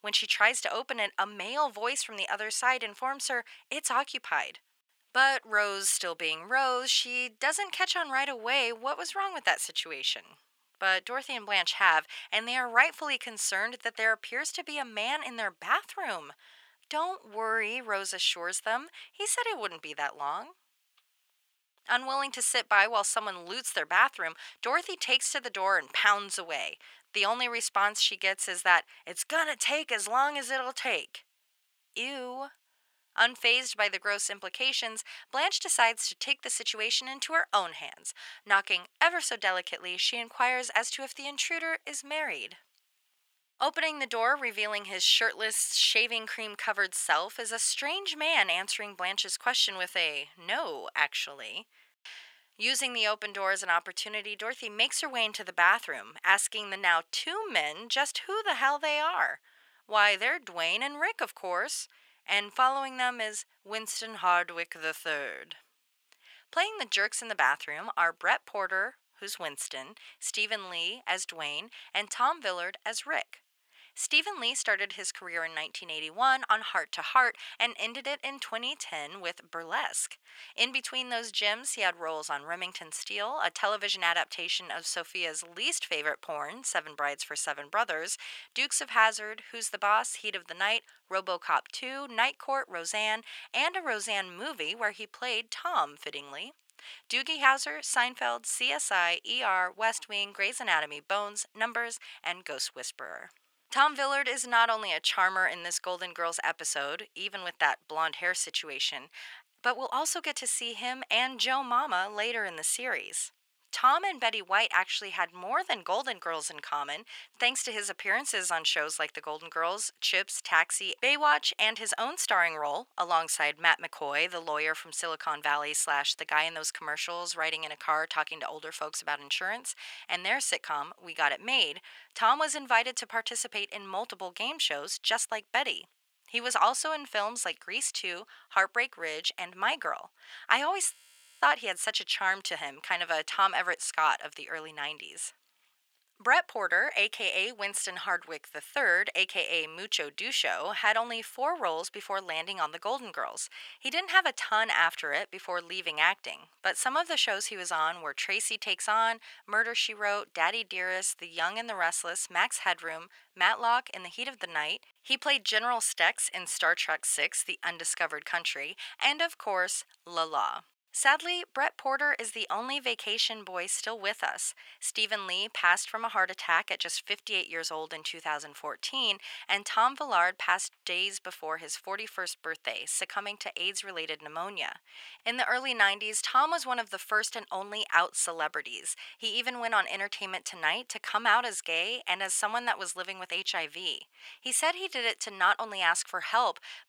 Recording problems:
thin; very; fading below 850 Hz
audio freezing; at 2:21

